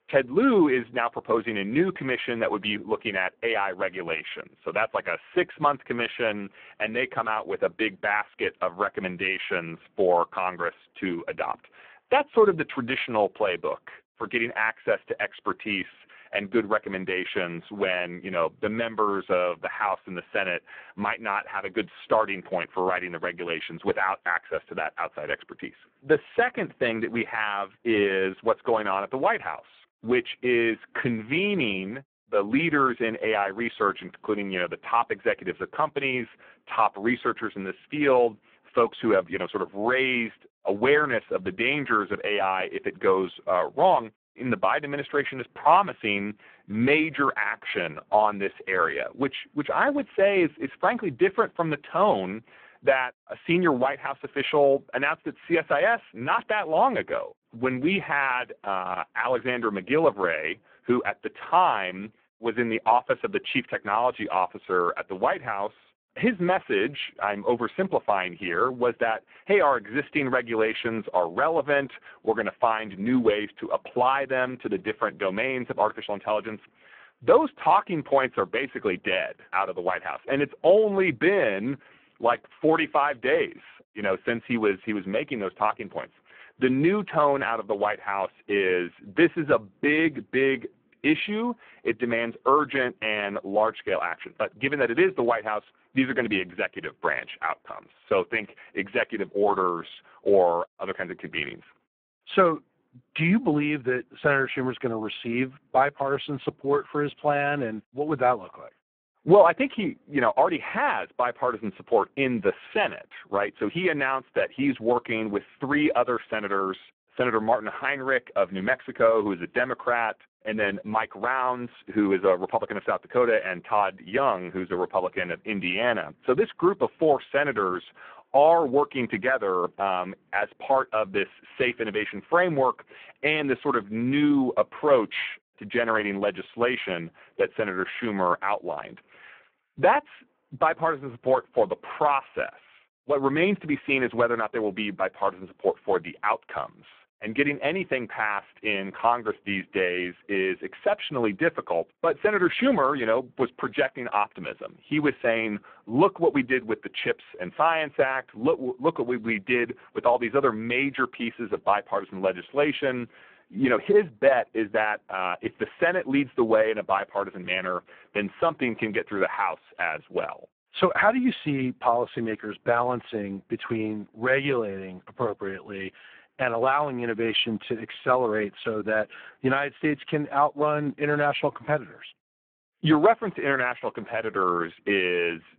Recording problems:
phone-call audio; poor line

